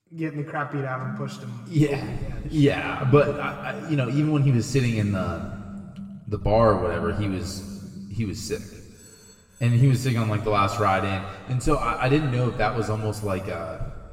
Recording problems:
room echo; noticeable; dies away in 1.8 s
off-mic speech; somewhat distant
alarms or sirens; noticeable; until 10 s; 15 dB below the speech

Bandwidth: 16 kHz